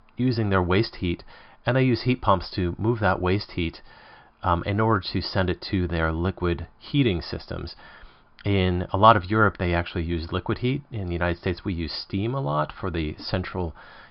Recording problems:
high frequencies cut off; noticeable; nothing above 5 kHz

